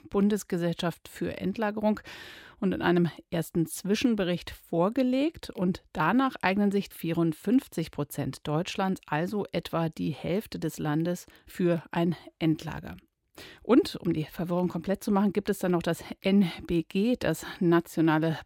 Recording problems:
none

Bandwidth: 16.5 kHz